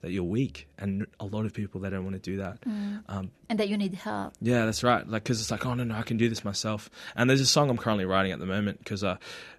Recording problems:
none

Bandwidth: 13.5 kHz